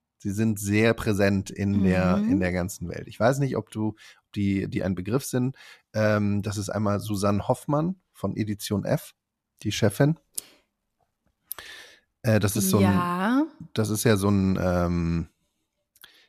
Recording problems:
none

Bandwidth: 14 kHz